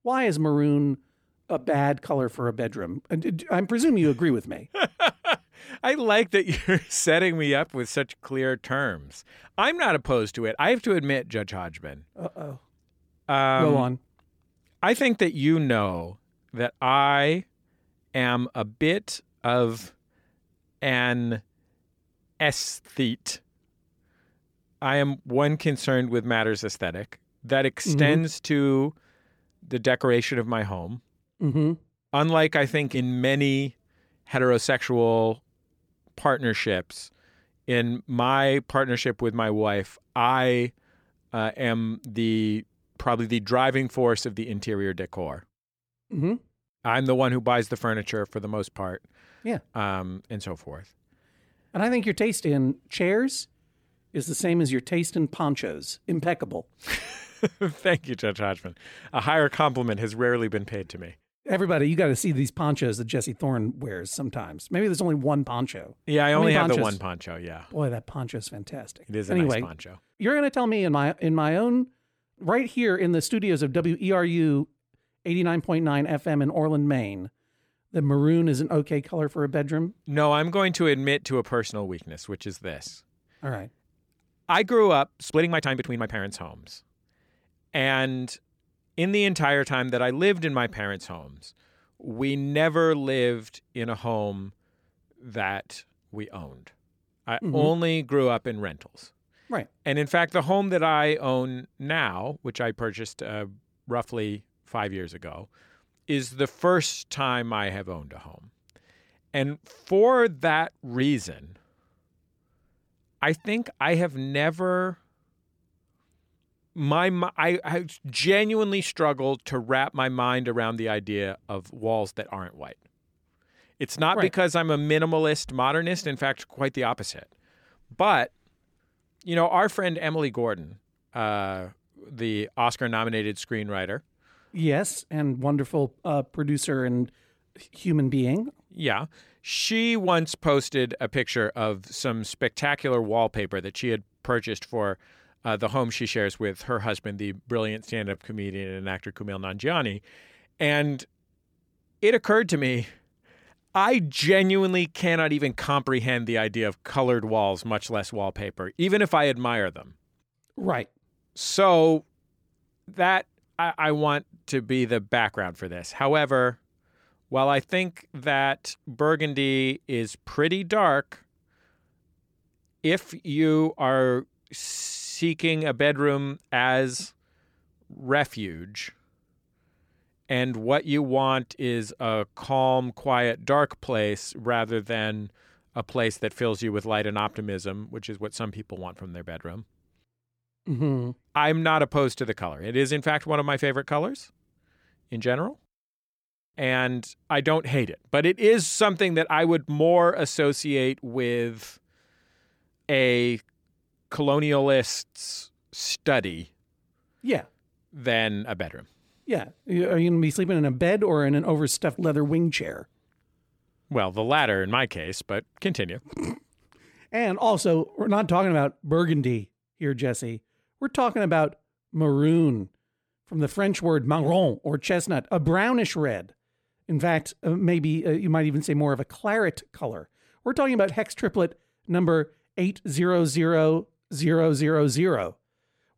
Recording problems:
uneven, jittery; strongly; from 1:10 to 3:30

